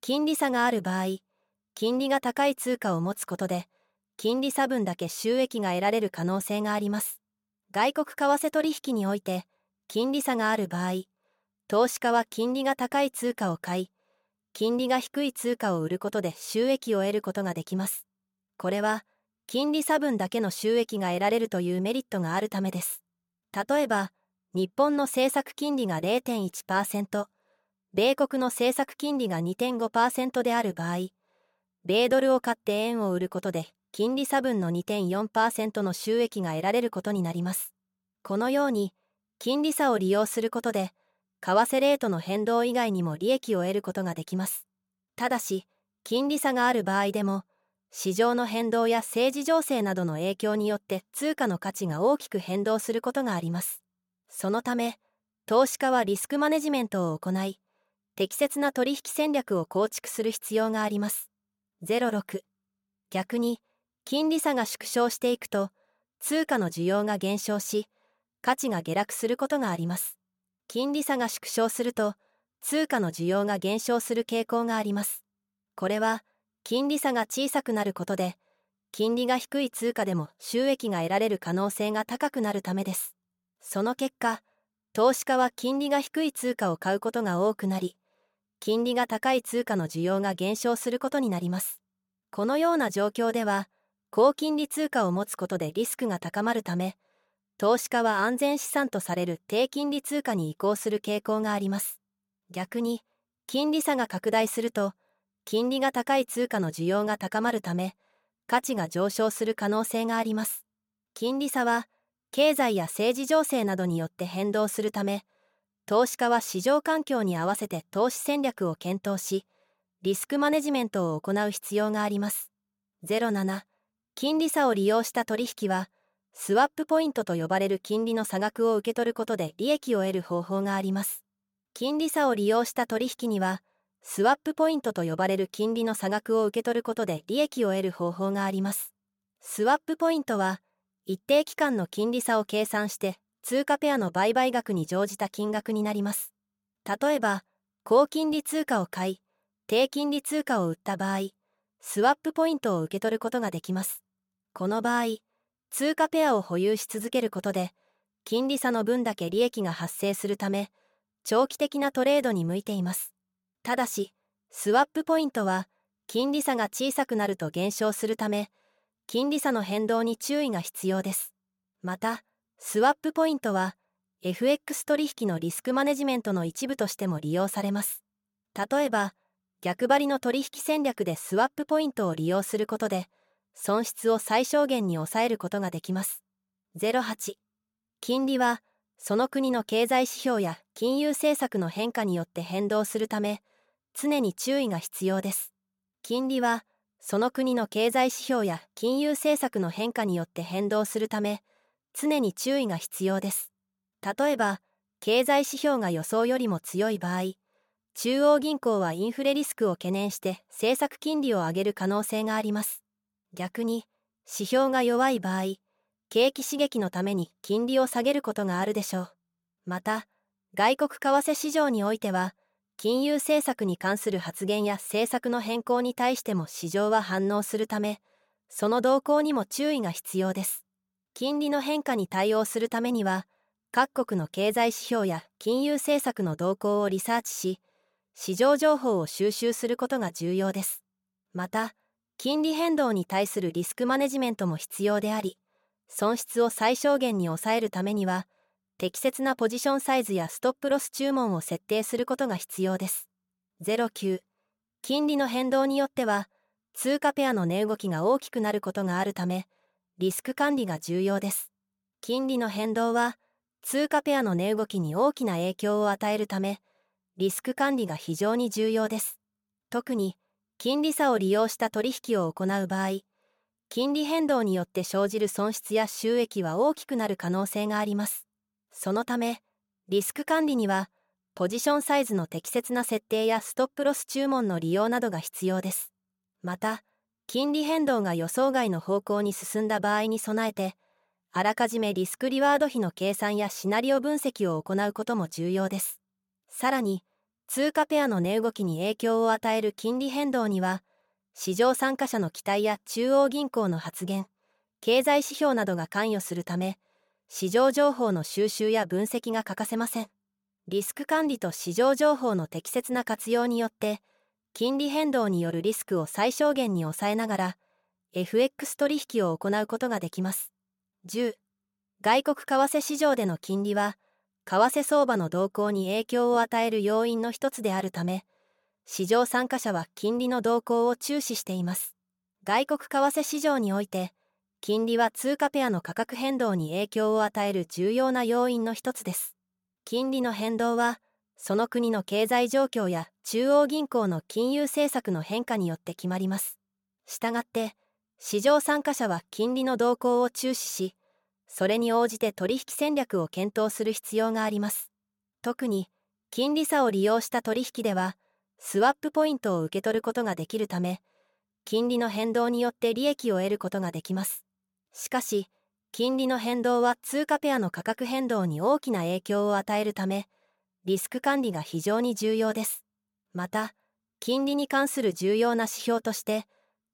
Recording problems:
none

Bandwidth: 17 kHz